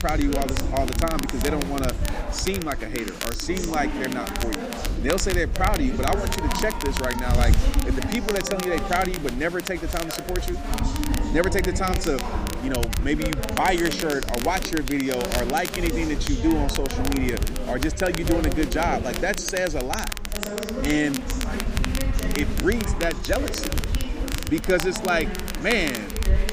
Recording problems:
chatter from many people; loud; throughout; 7 dB below the speech
crackle, like an old record; loud; 7 dB below the speech
wind noise on the microphone; occasional gusts; 20 dB below the speech

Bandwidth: 15 kHz